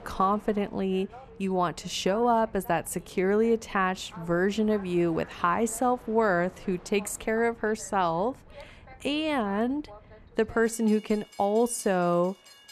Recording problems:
train or aircraft noise; faint; throughout; 20 dB below the speech

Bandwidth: 13.5 kHz